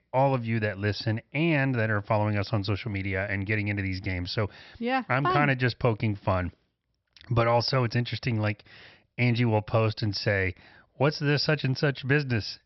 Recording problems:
high frequencies cut off; noticeable; nothing above 5.5 kHz

